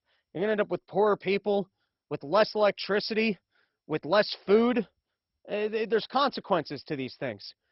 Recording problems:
garbled, watery; badly; nothing above 5.5 kHz

